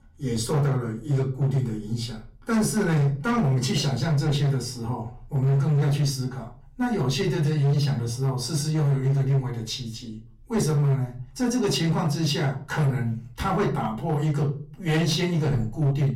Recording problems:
off-mic speech; far
distortion; slight; 12% of the sound clipped
room echo; very slight; dies away in 0.3 s

